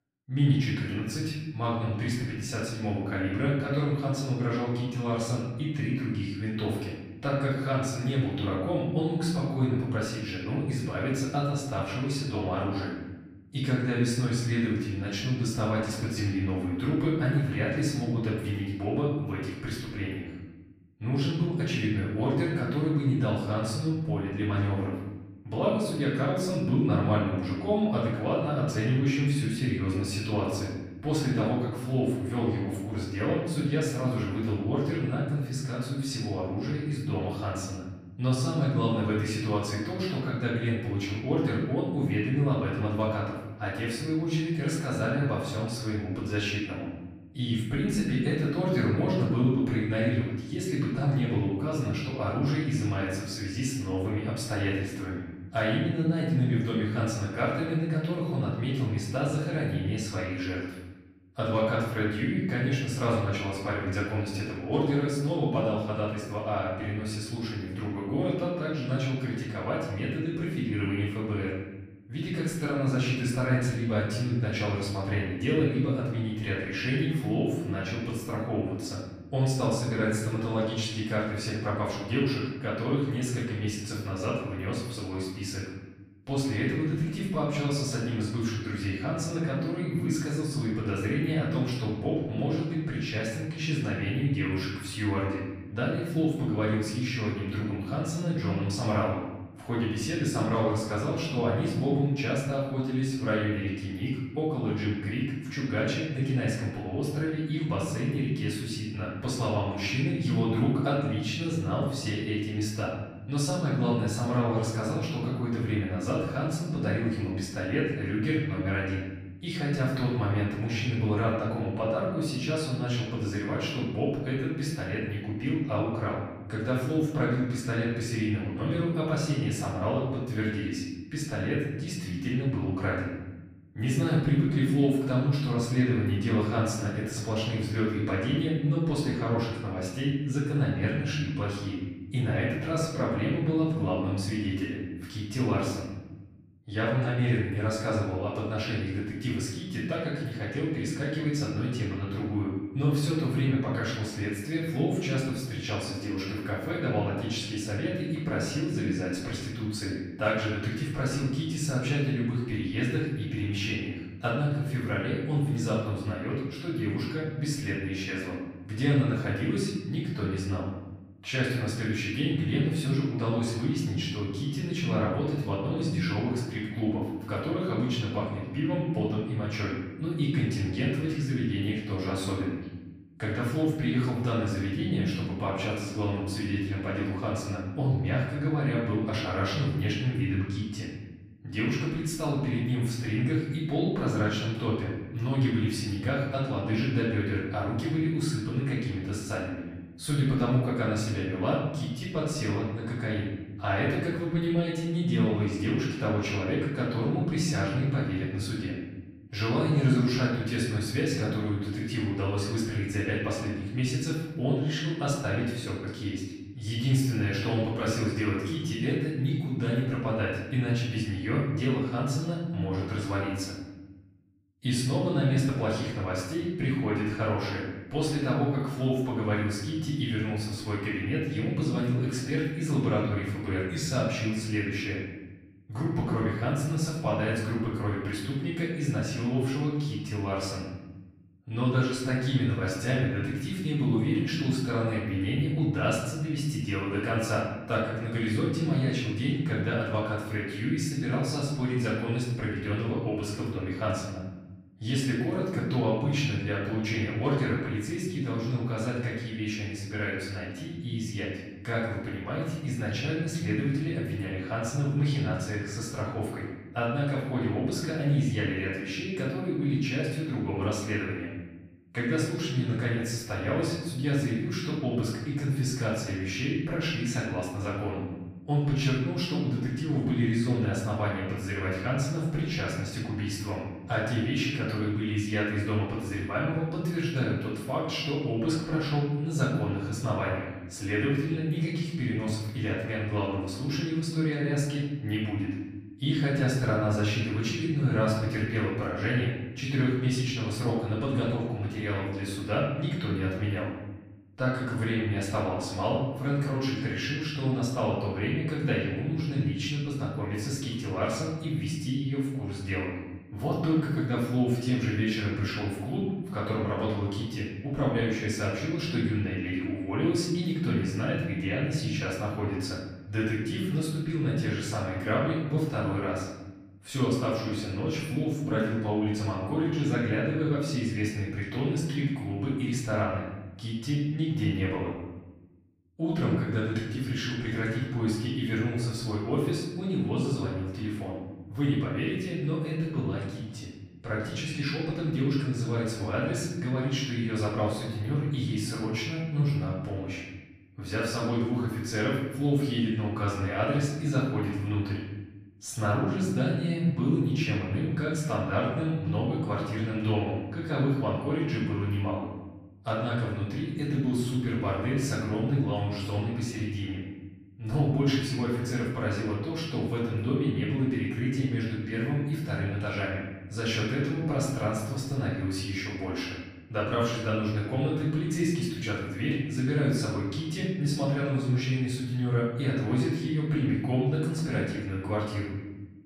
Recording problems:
off-mic speech; far
room echo; noticeable; dies away in 1.1 s

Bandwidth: 15 kHz